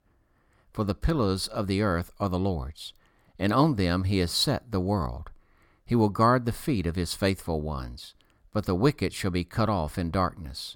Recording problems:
none

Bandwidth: 17.5 kHz